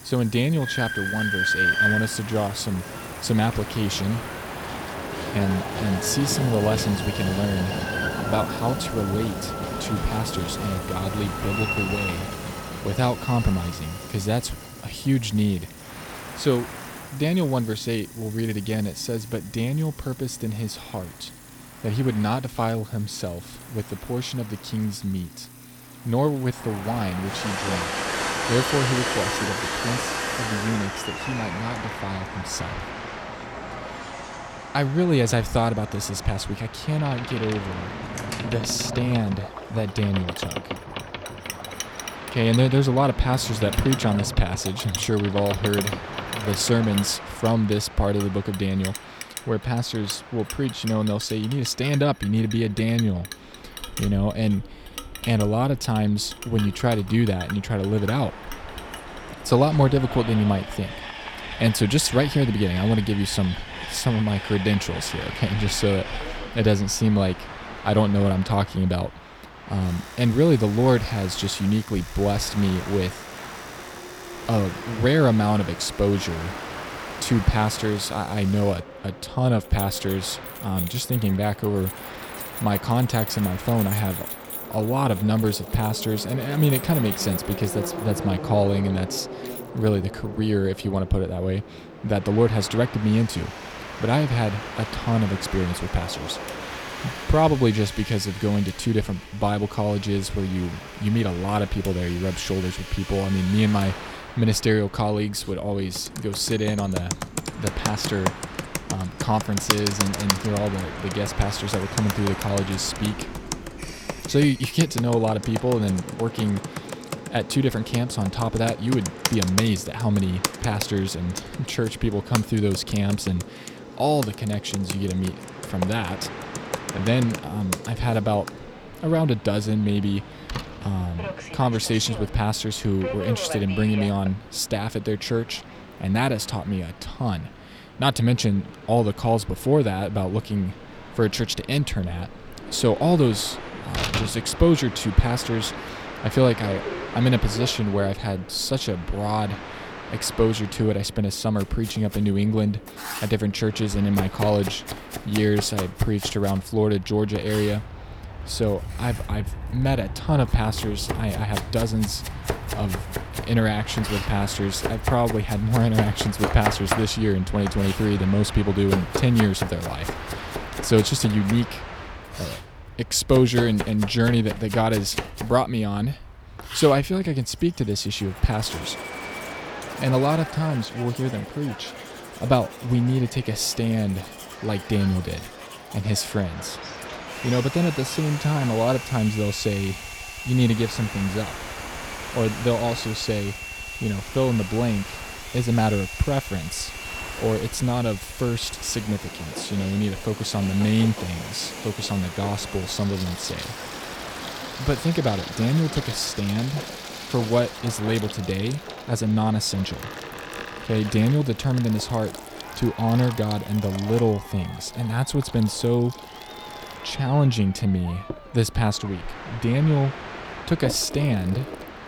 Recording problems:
household noises; noticeable; throughout; 10 dB below the speech
train or aircraft noise; noticeable; throughout; 10 dB below the speech

